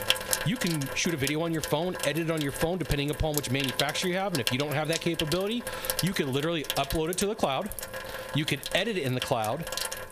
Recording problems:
squashed, flat; somewhat, background pumping
household noises; loud; throughout; 5 dB below the speech

